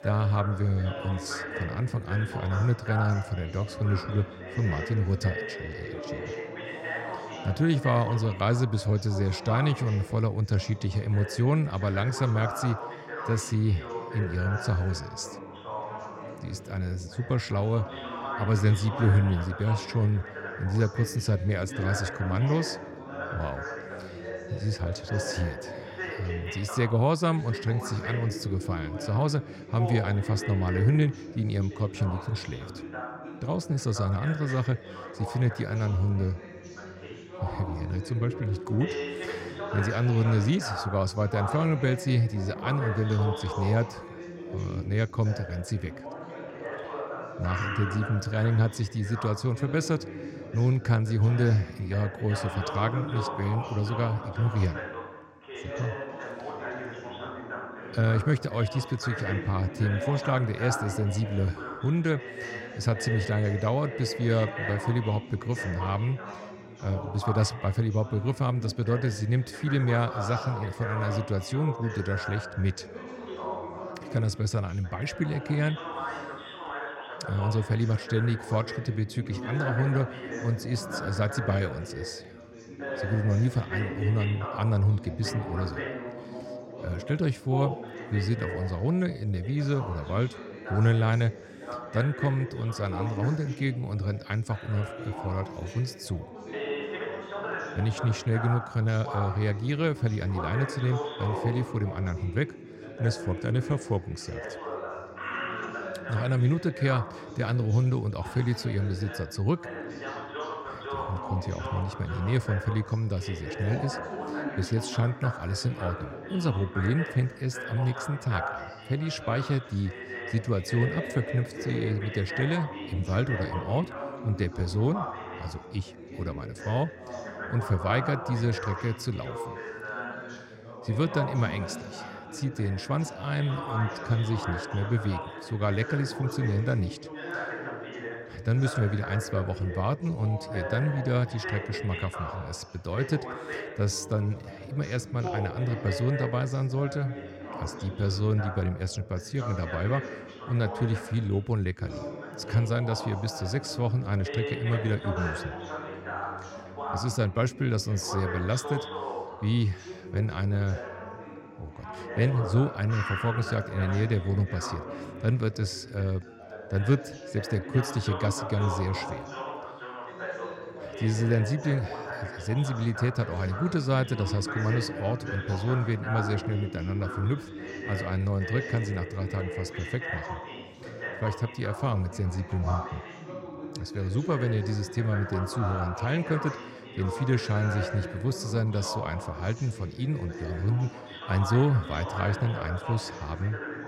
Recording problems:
background chatter; loud; throughout; 3 voices, 8 dB below the speech

